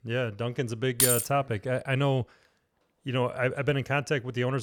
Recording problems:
jangling keys; loud; at 1 s; peak 5 dB above the speech
abrupt cut into speech; at the end

